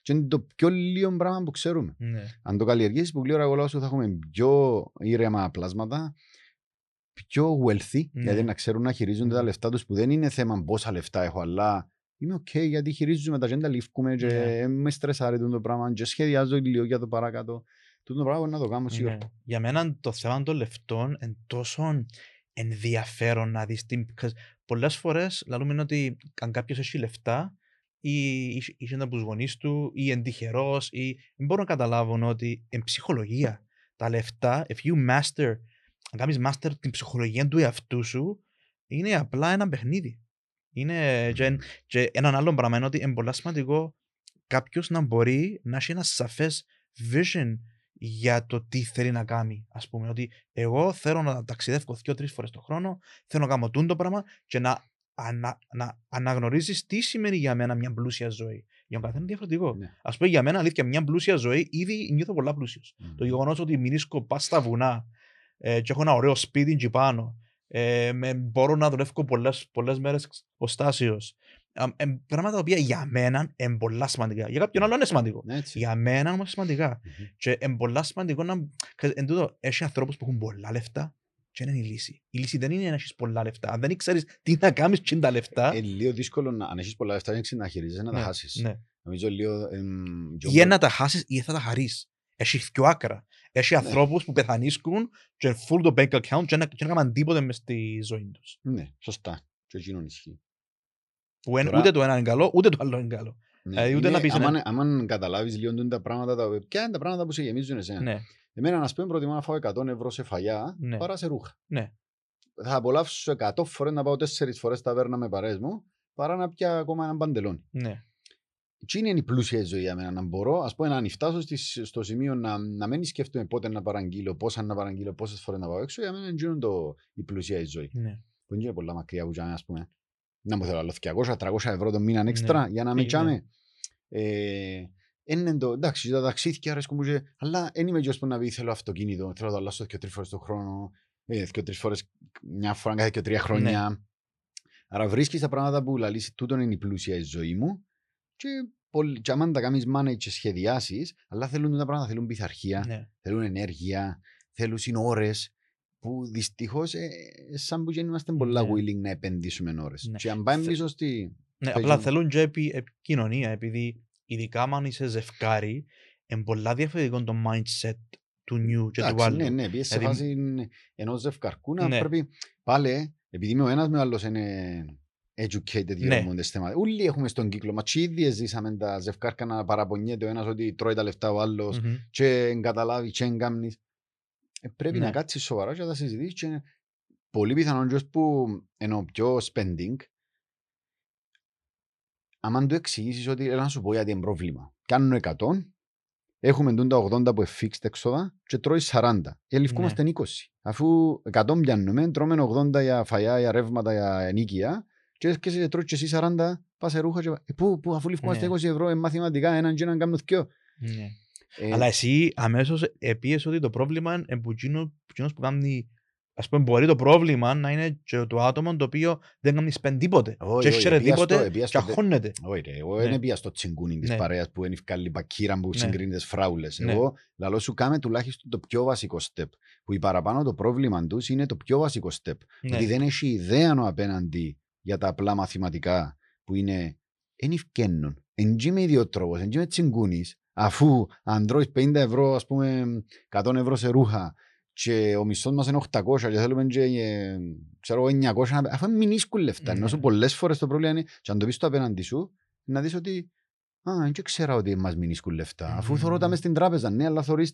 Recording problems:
none

